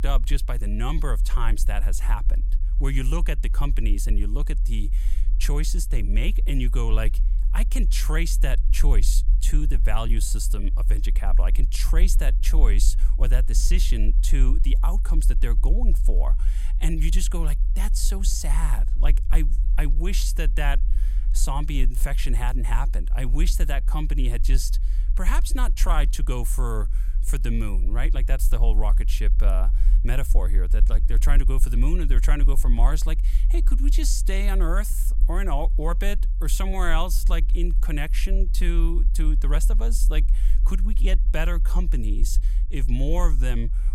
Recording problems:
low rumble; noticeable; throughout; 15 dB below the speech

